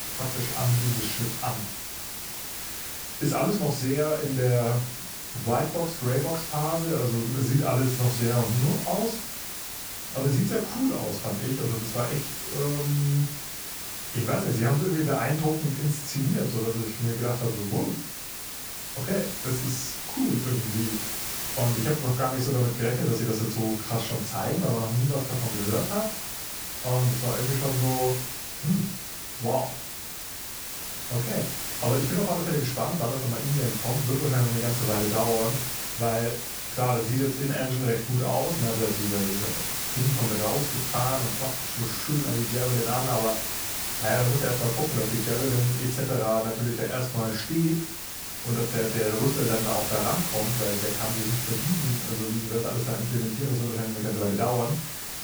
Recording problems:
off-mic speech; far
room echo; slight; dies away in 0.3 s
hiss; loud; throughout; 3 dB below the speech

